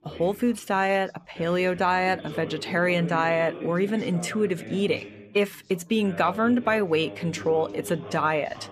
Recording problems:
background chatter; noticeable; throughout; 2 voices, 15 dB below the speech

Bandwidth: 14.5 kHz